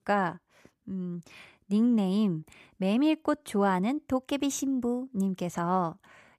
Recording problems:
none

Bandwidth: 14.5 kHz